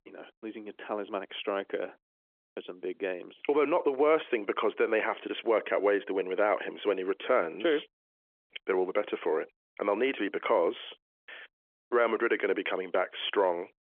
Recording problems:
phone-call audio; nothing above 3.5 kHz

